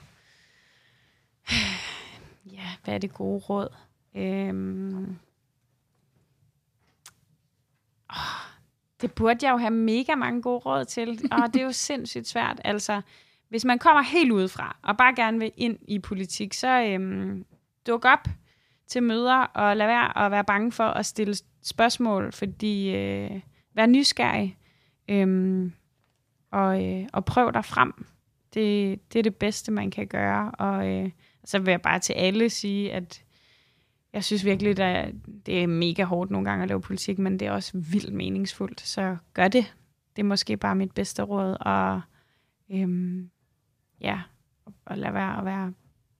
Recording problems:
none

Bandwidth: 14.5 kHz